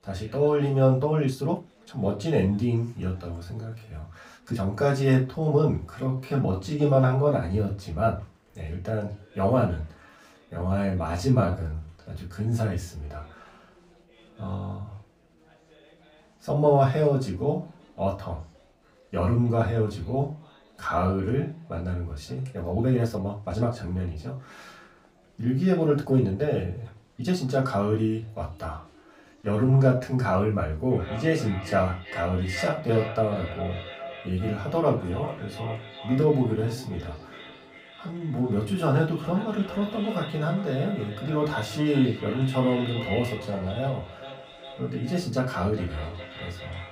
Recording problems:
off-mic speech; far
echo of what is said; noticeable; from 31 s on; 400 ms later, 15 dB below the speech
room echo; very slight; dies away in 0.2 s
chatter from many people; faint; throughout; 30 dB below the speech
uneven, jittery; strongly; from 1 to 44 s

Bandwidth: 15.5 kHz